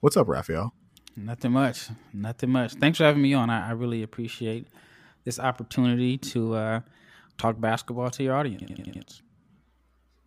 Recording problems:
audio stuttering; at 8.5 s

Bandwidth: 15 kHz